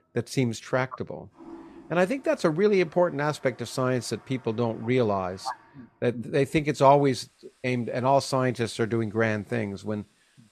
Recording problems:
household noises; faint; throughout; 30 dB below the speech

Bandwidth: 13.5 kHz